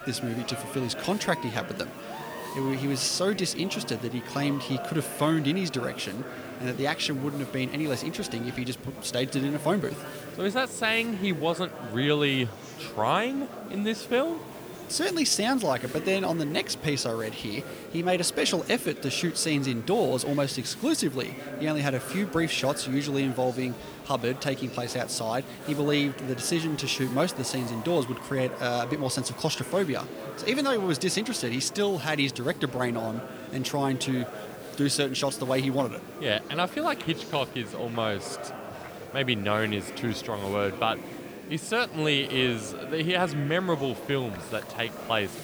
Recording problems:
murmuring crowd; noticeable; throughout; 10 dB below the speech
hiss; faint; throughout; 20 dB below the speech

